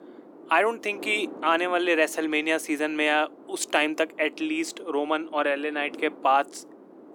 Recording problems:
thin; somewhat; fading below 300 Hz
wind noise on the microphone; occasional gusts; 20 dB below the speech

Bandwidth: 18.5 kHz